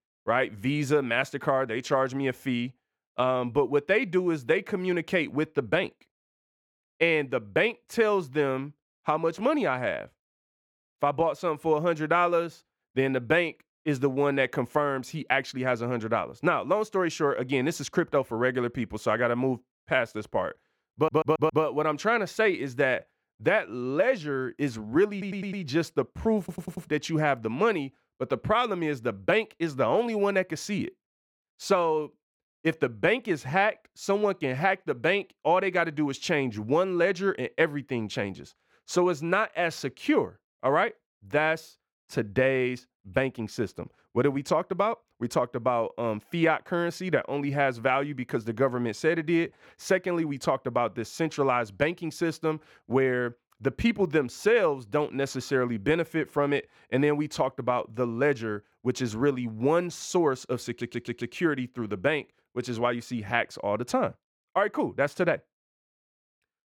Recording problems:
muffled; slightly; fading above 3.5 kHz
audio stuttering; 4 times, first at 21 s

